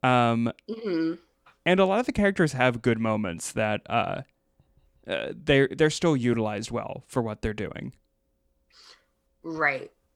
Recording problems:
none

